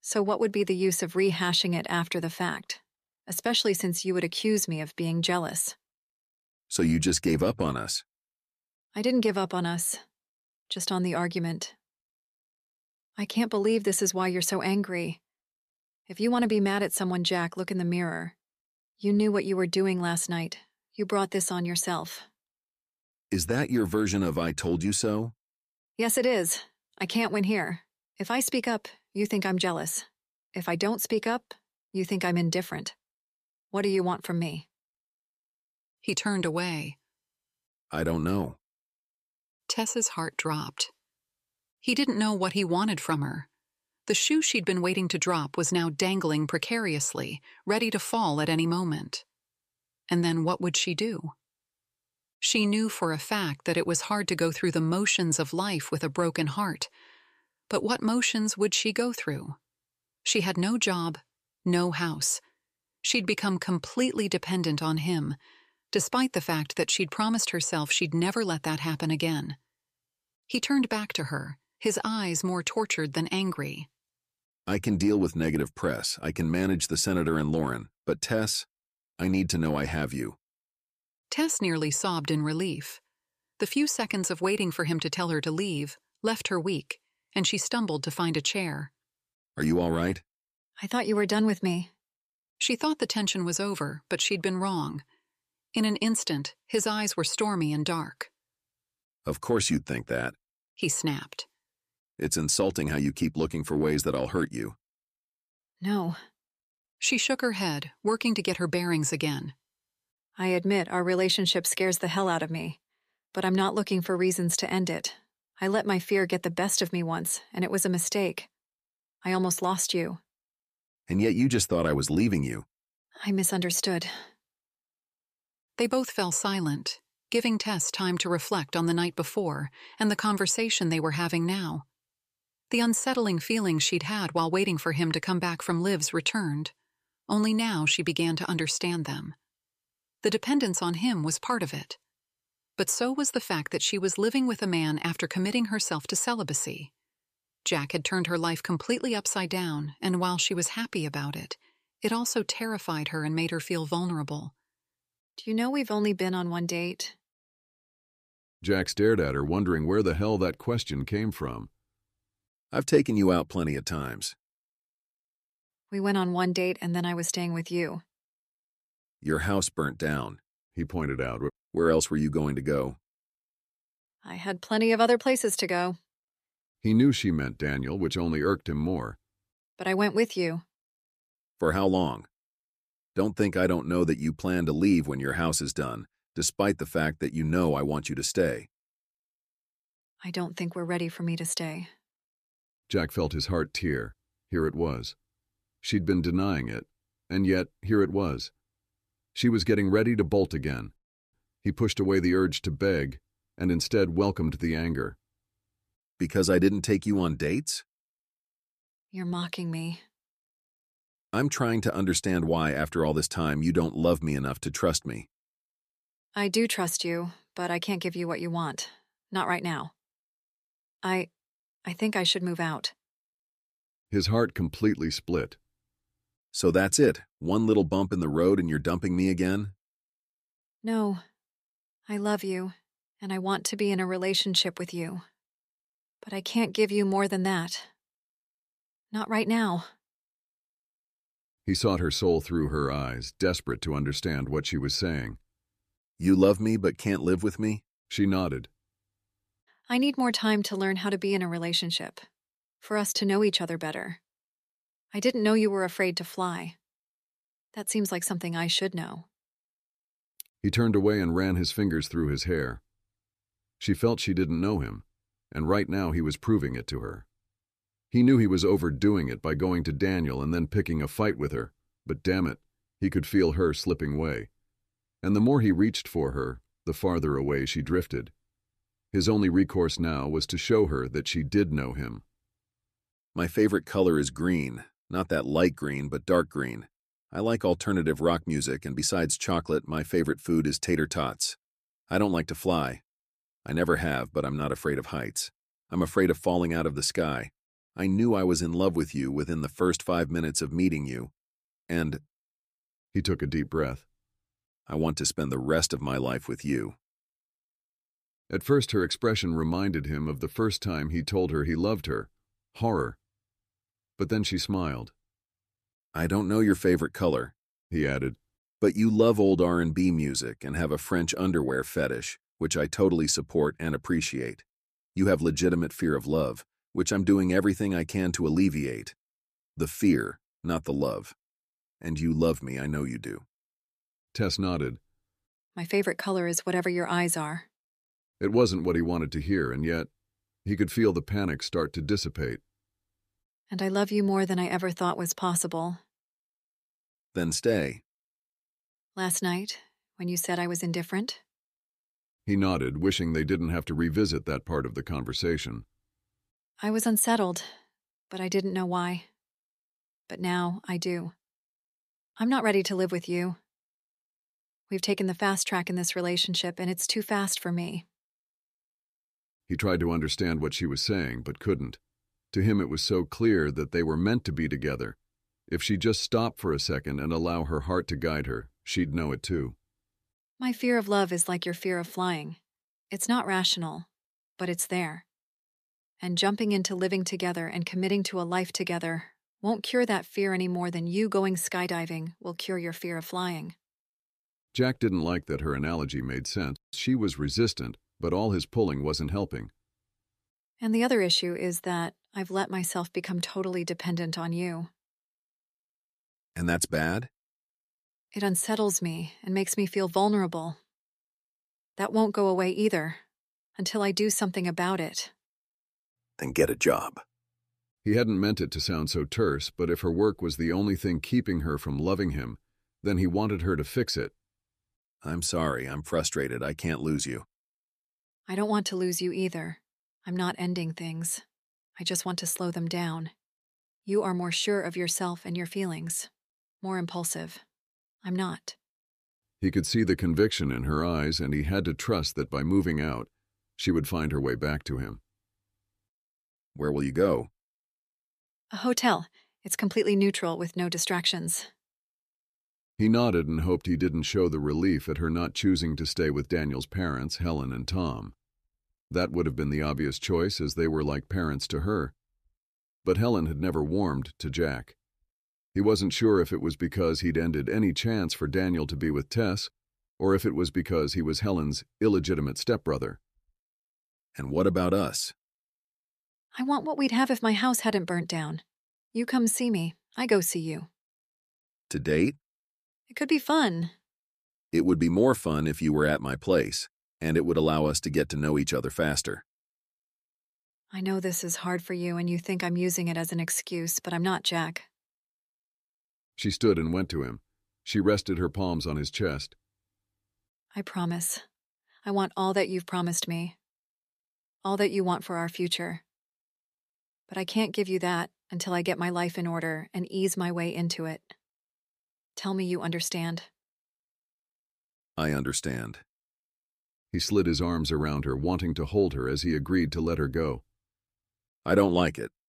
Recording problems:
none

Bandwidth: 14.5 kHz